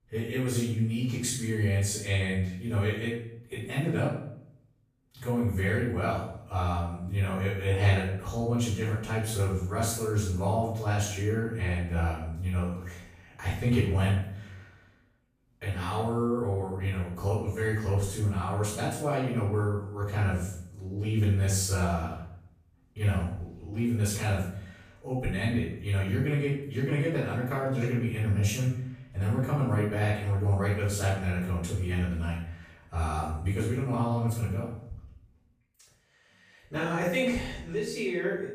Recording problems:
off-mic speech; far
room echo; noticeable; dies away in 0.6 s

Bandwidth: 15 kHz